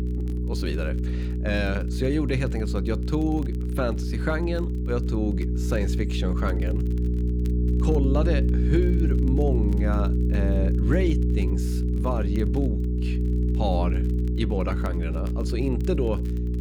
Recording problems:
electrical hum; loud; throughout; 60 Hz, 5 dB below the speech
crackle, like an old record; faint; 30 dB below the speech

